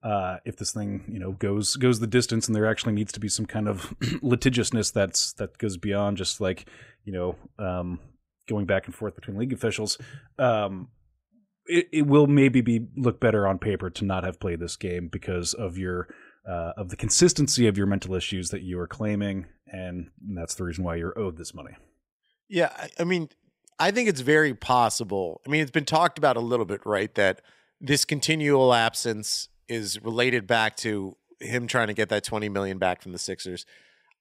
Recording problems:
none

